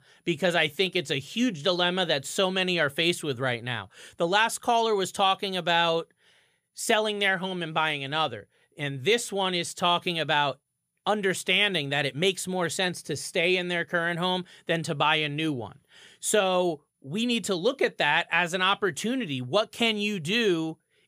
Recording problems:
none

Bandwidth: 15 kHz